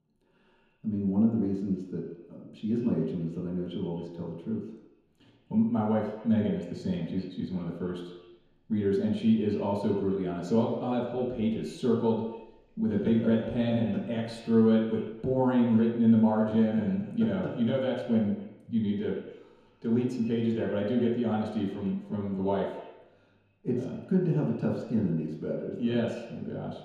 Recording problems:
off-mic speech; far
echo of what is said; noticeable; throughout; 130 ms later, 15 dB below the speech
room echo; noticeable; dies away in 0.9 s

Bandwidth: 14.5 kHz